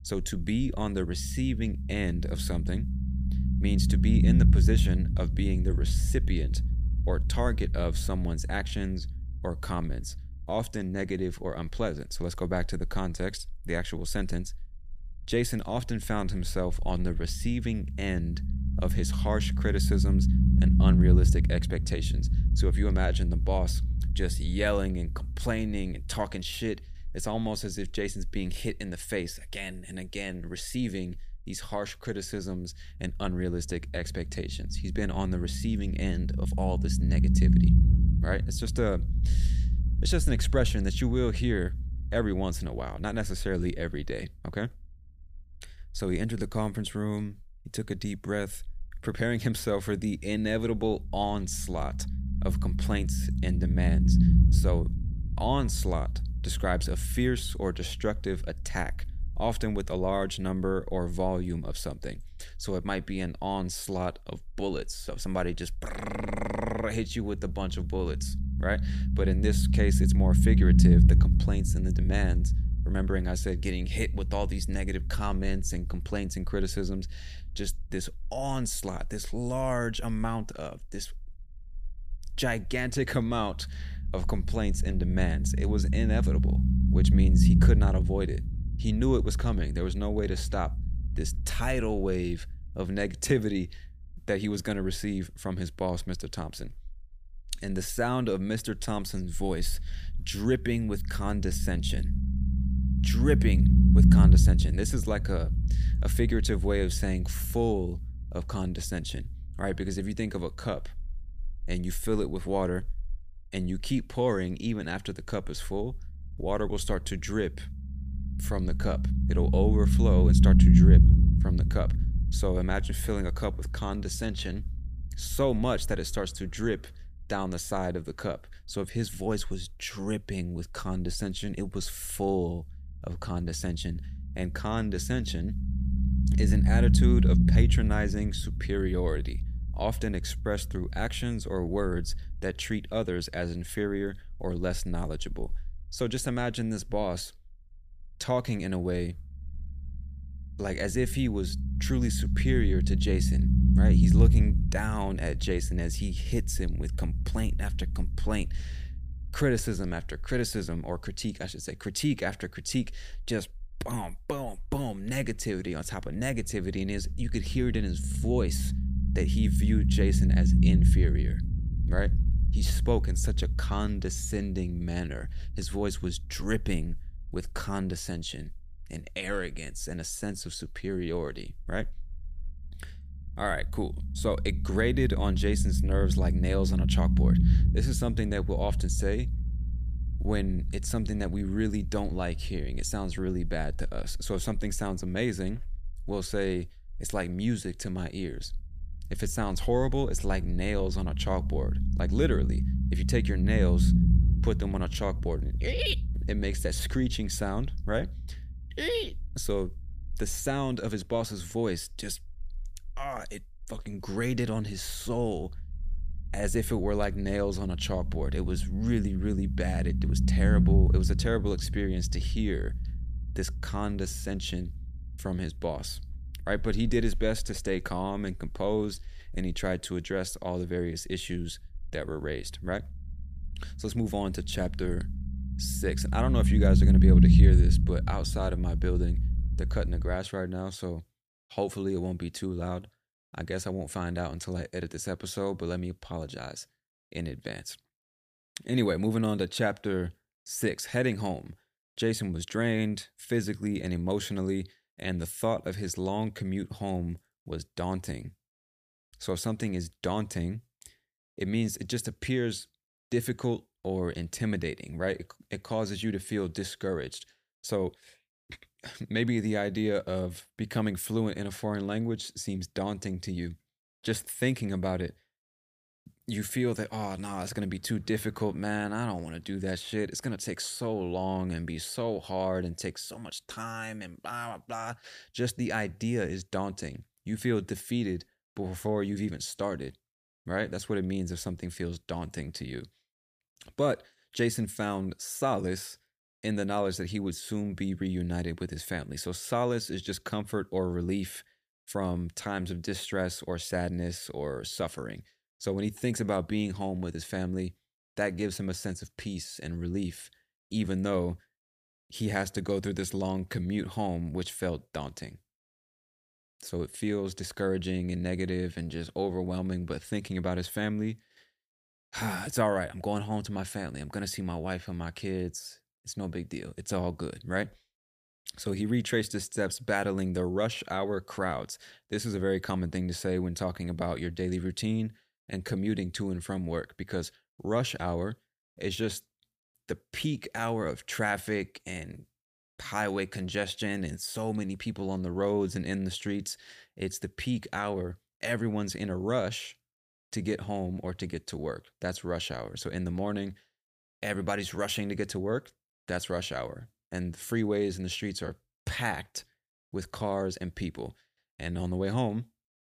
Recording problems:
low rumble; loud; until 4:00; 5 dB below the speech

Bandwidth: 15 kHz